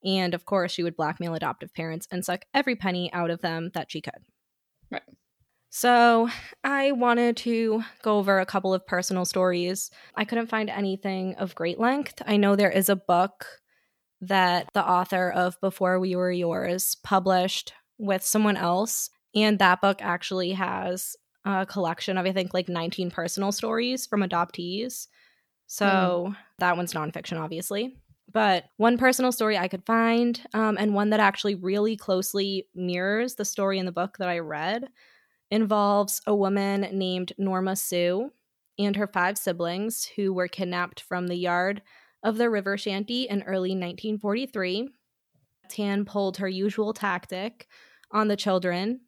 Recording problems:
none

